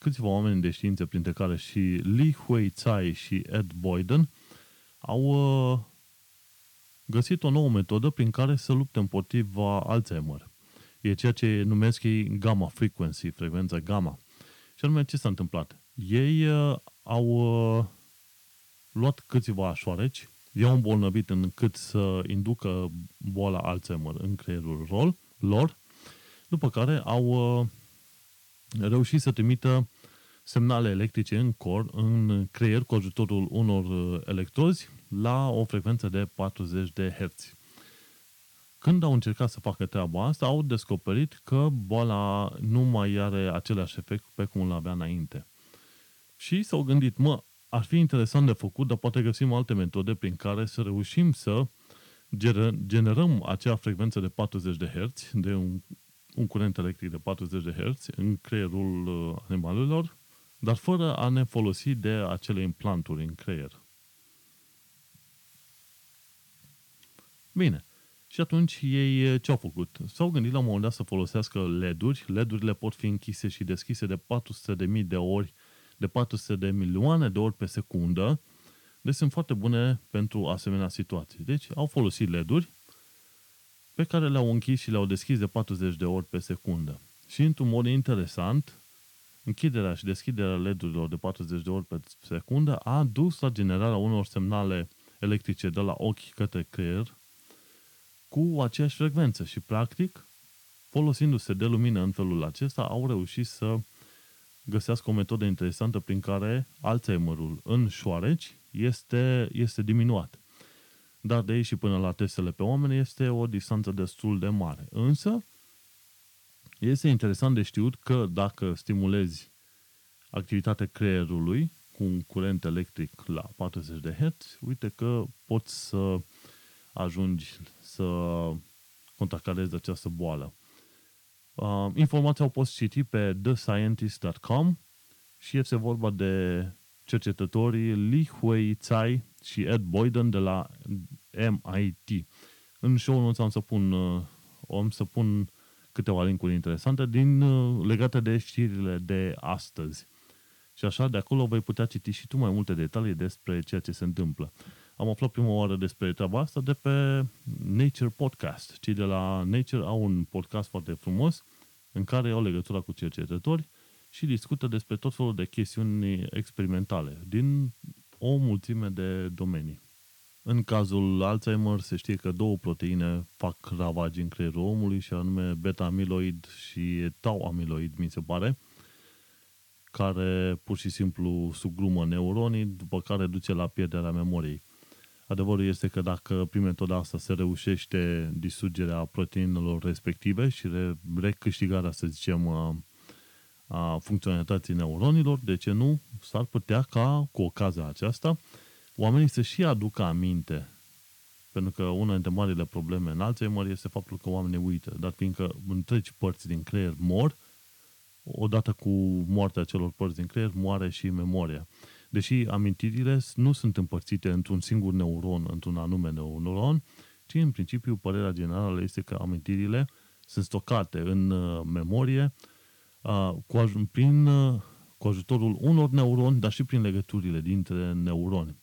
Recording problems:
hiss; faint; throughout; 30 dB below the speech

